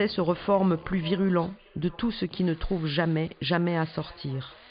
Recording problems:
high frequencies cut off; severe; nothing above 5 kHz
echo of what is said; faint; throughout; 530 ms later, 25 dB below the speech
machinery noise; faint; throughout; 25 dB below the speech
abrupt cut into speech; at the start

